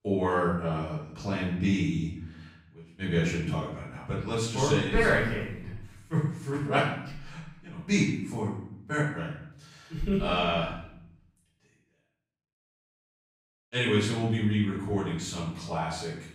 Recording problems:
off-mic speech; far
room echo; noticeable; dies away in 0.7 s

